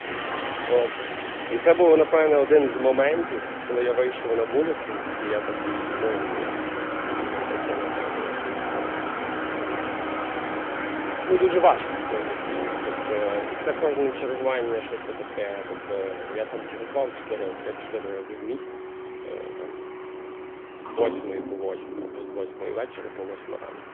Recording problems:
phone-call audio; nothing above 3.5 kHz
traffic noise; loud; throughout; 5 dB below the speech

